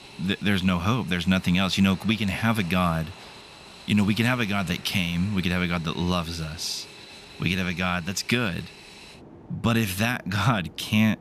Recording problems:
train or aircraft noise; noticeable; throughout; 20 dB below the speech

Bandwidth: 14.5 kHz